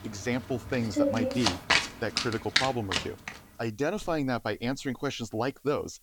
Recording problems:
household noises; very loud; throughout; 3 dB above the speech
hiss; faint; throughout; 25 dB below the speech

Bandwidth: 18.5 kHz